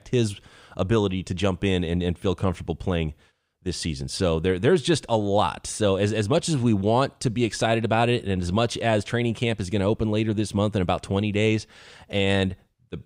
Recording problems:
none

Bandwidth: 15.5 kHz